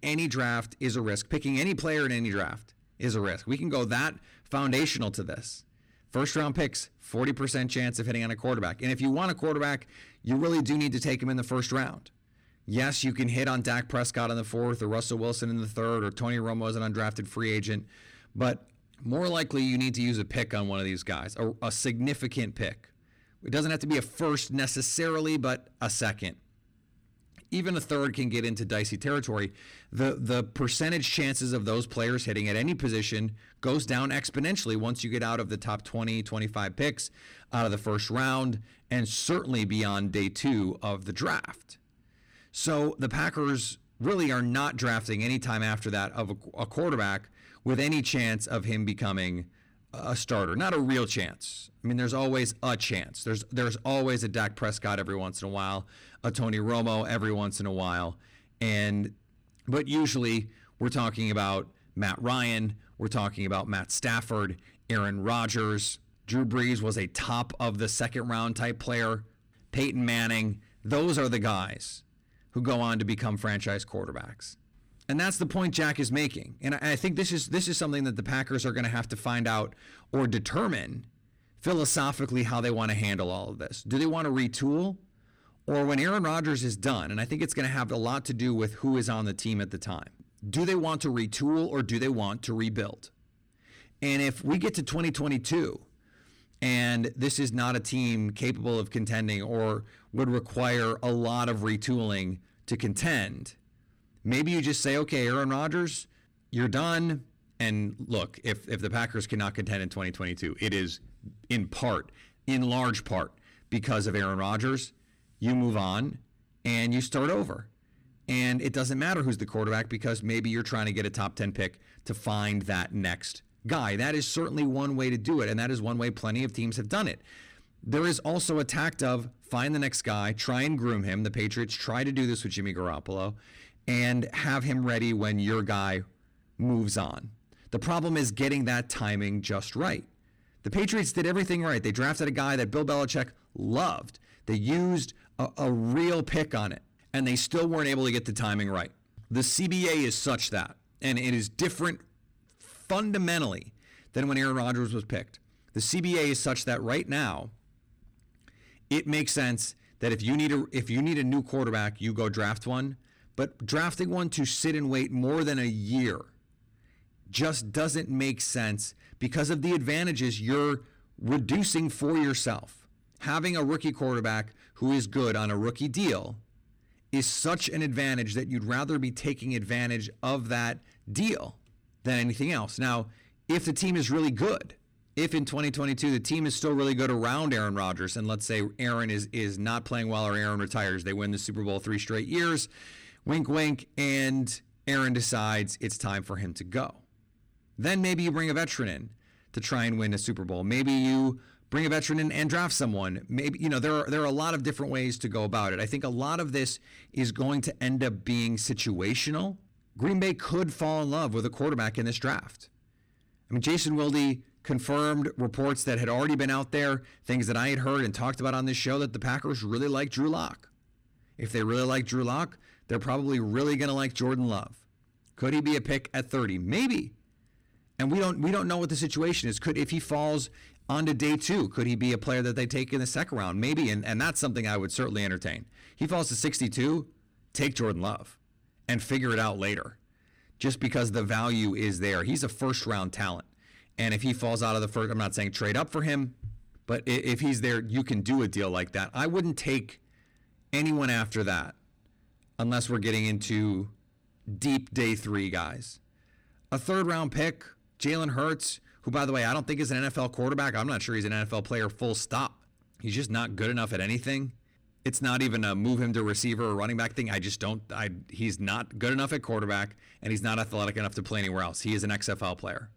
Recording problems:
distortion; slight; 10 dB below the speech

